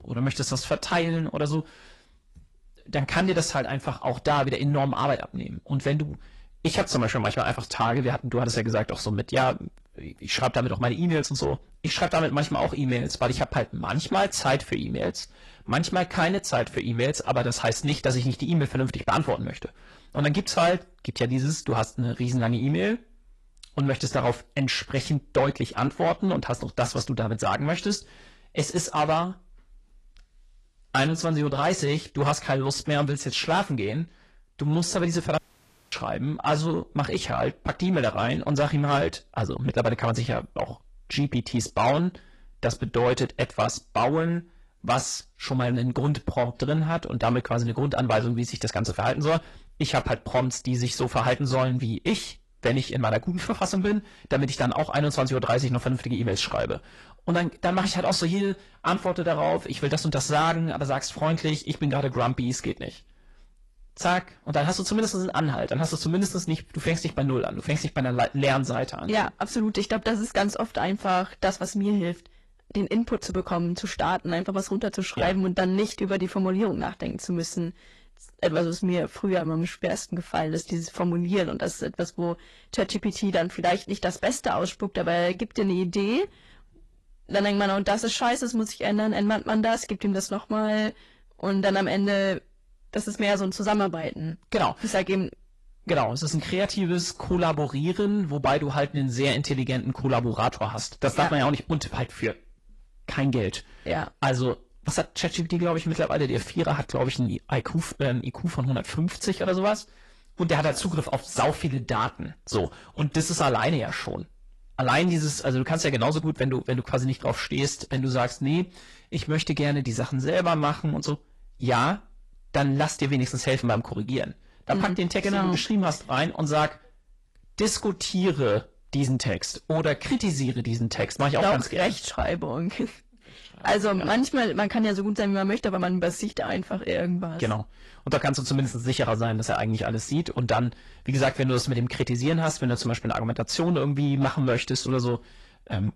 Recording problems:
distortion; slight; 10 dB below the speech
garbled, watery; slightly; nothing above 11.5 kHz
audio cutting out; at 35 s for 0.5 s

